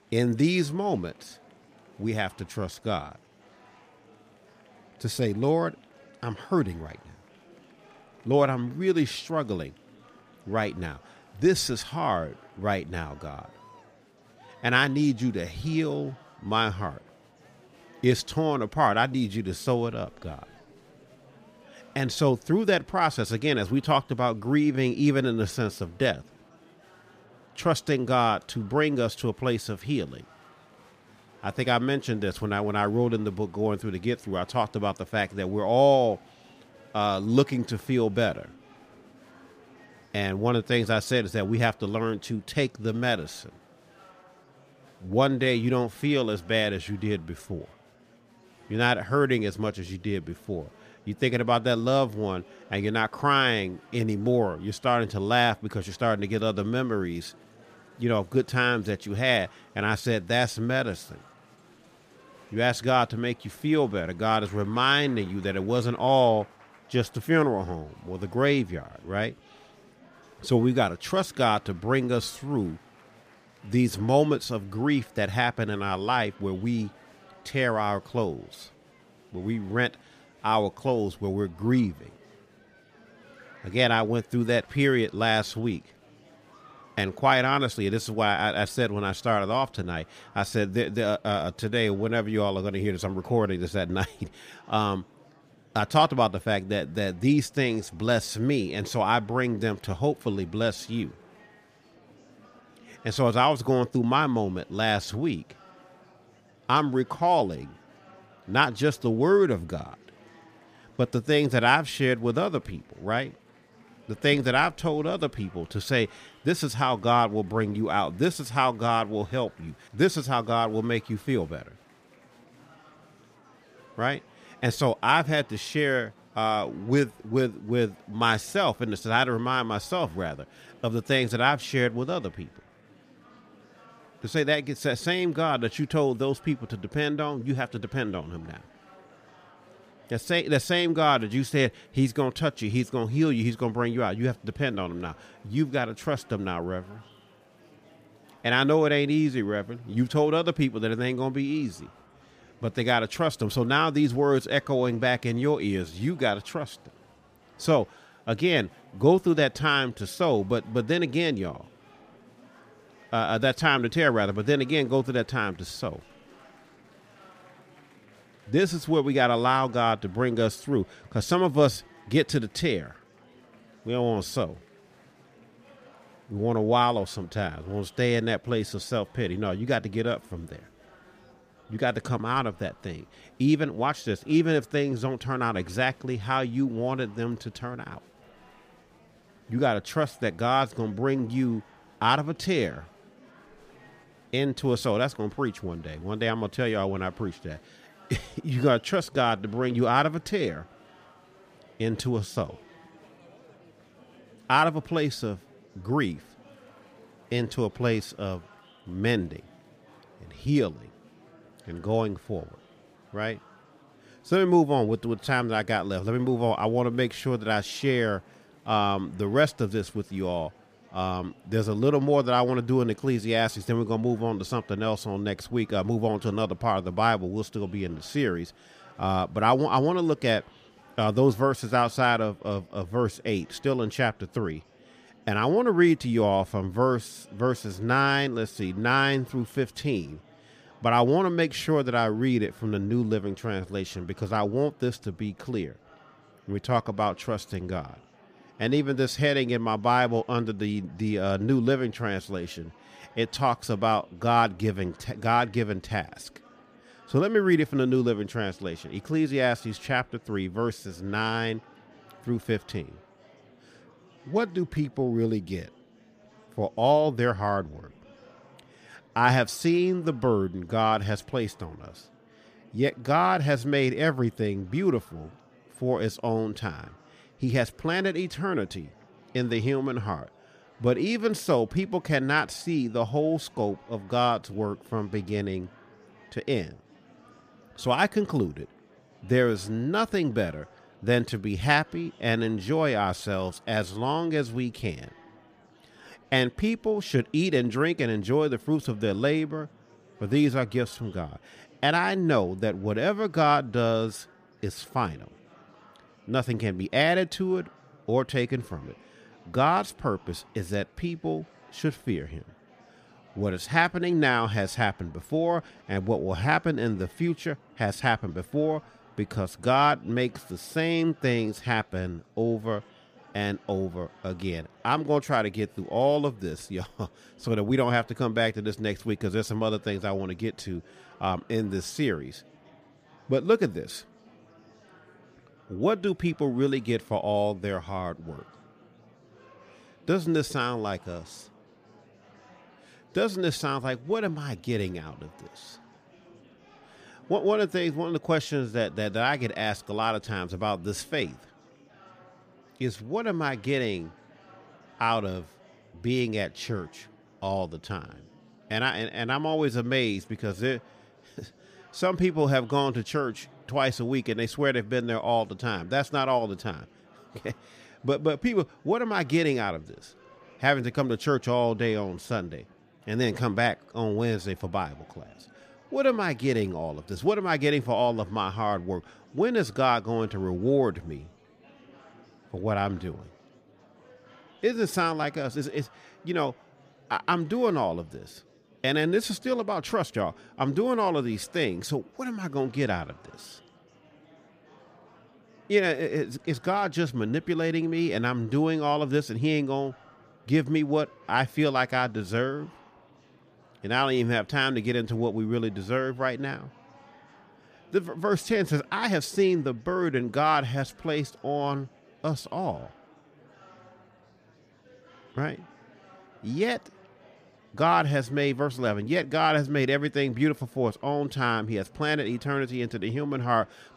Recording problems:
murmuring crowd; faint; throughout; 30 dB below the speech

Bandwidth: 15 kHz